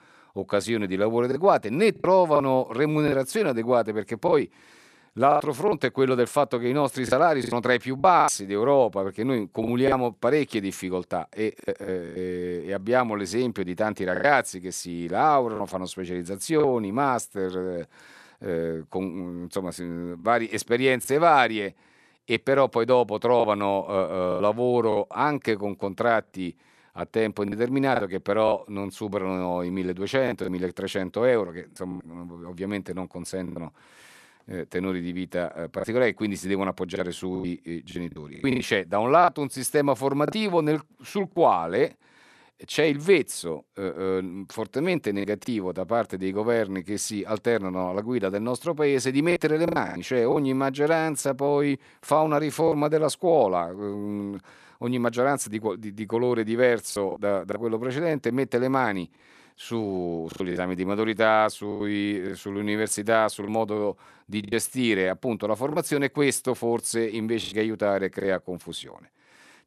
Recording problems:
choppy; occasionally; 5% of the speech affected

